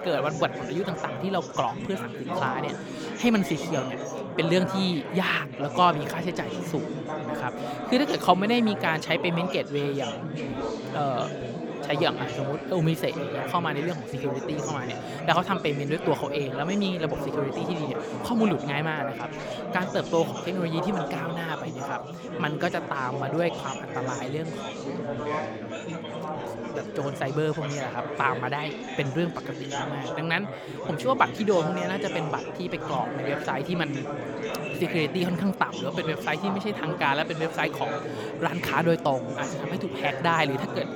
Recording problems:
chatter from many people; loud; throughout; 5 dB below the speech

